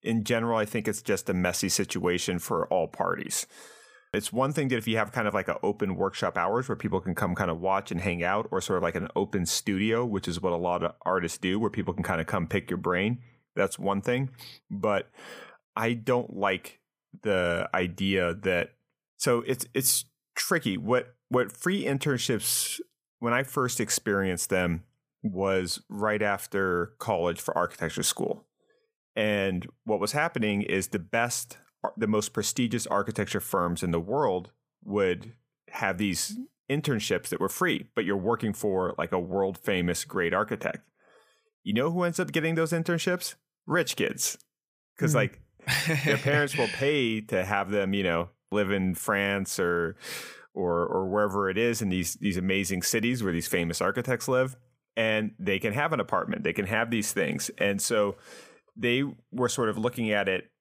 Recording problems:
none

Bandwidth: 15 kHz